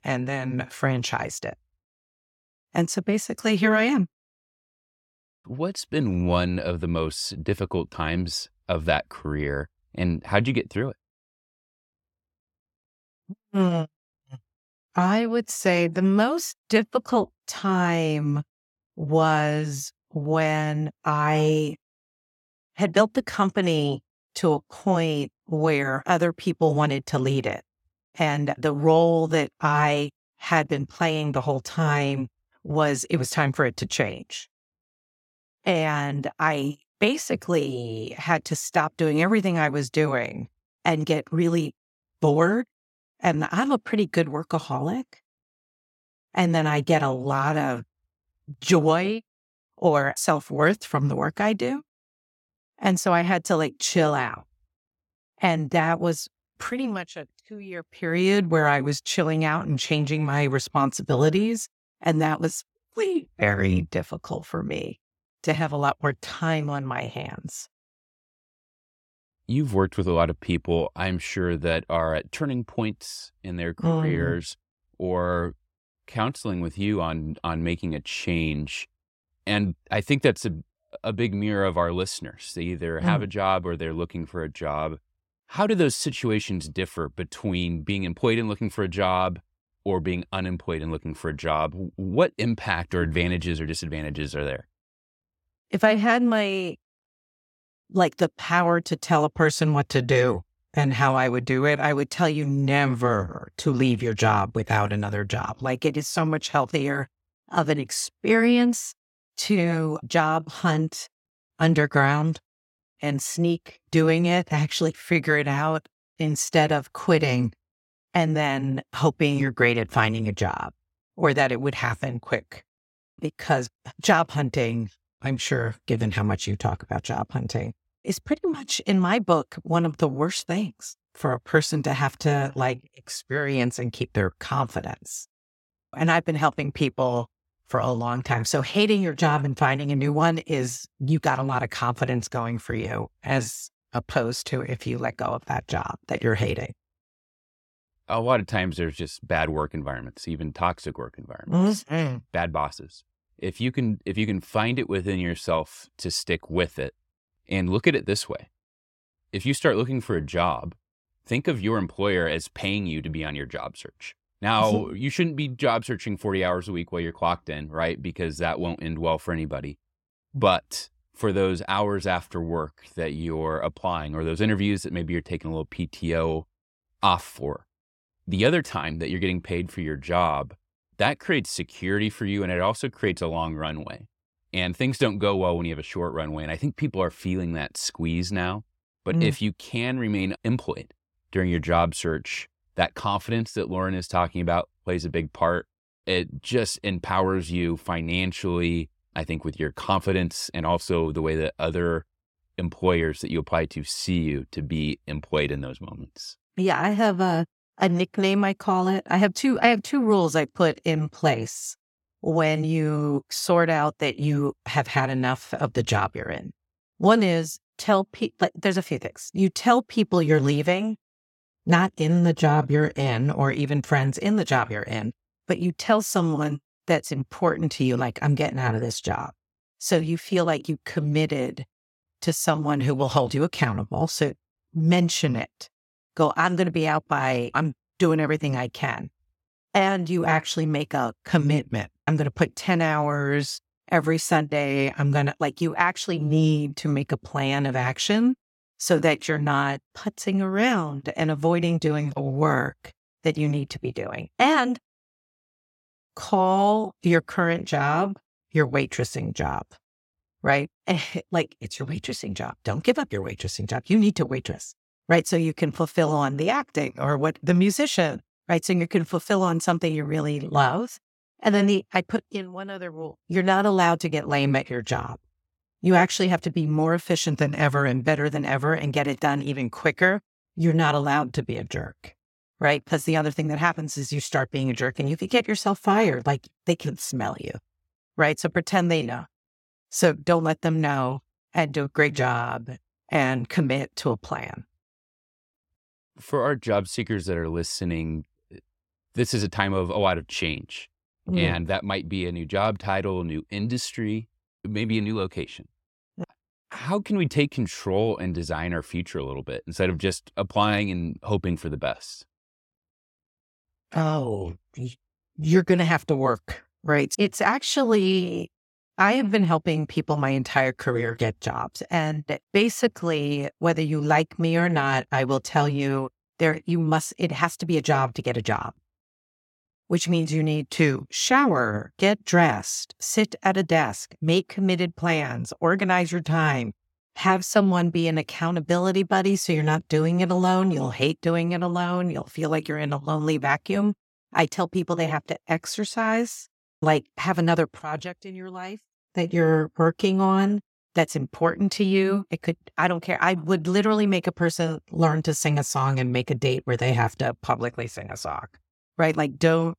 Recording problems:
none

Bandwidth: 16.5 kHz